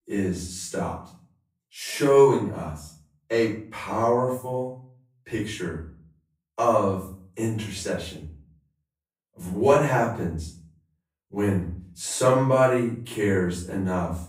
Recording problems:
off-mic speech; far
room echo; noticeable; dies away in 0.4 s

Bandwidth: 15.5 kHz